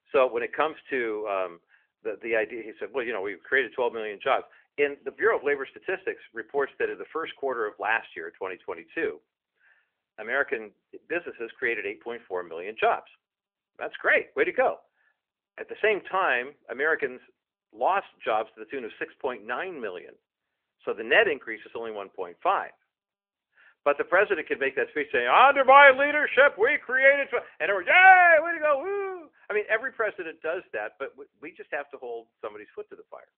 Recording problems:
phone-call audio; nothing above 3 kHz

